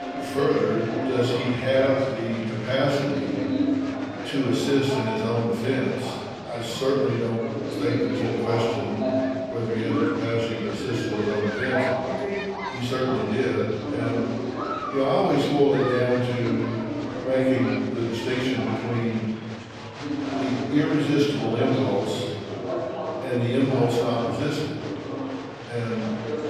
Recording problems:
off-mic speech; far
room echo; noticeable; dies away in 1.3 s
chatter from many people; loud; throughout; 4 dB below the speech

